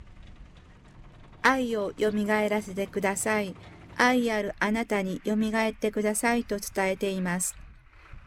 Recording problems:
traffic noise; faint; throughout; 25 dB below the speech

